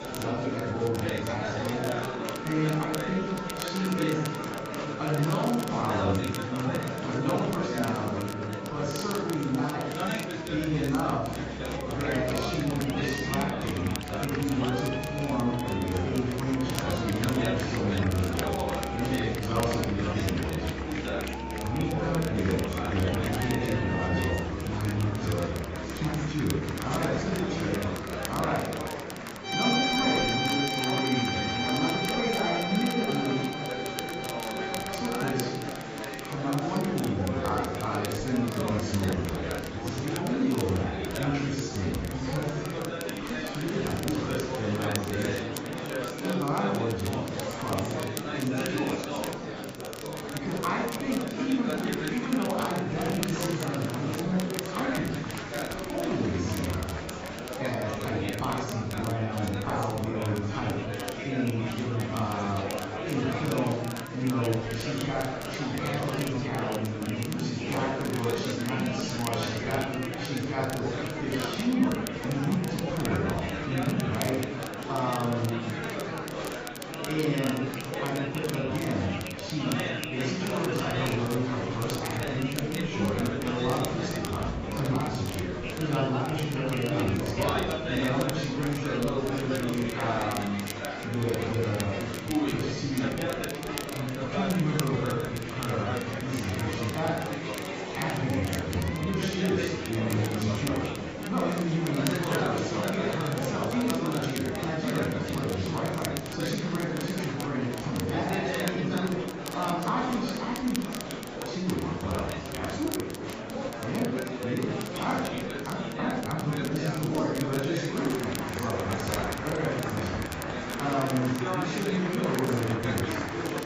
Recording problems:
garbled, watery; badly; nothing above 7.5 kHz
room echo; noticeable; dies away in 0.8 s
off-mic speech; somewhat distant
background music; loud; throughout; 6 dB below the speech
murmuring crowd; loud; throughout; 3 dB below the speech
crackle, like an old record; noticeable; 10 dB below the speech

